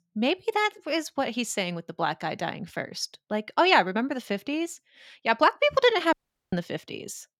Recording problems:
audio cutting out; at 6 s

